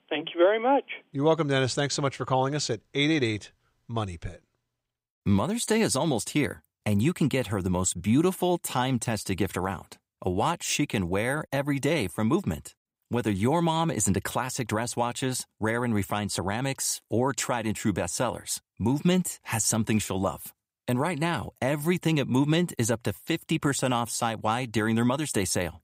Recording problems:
none

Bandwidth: 15.5 kHz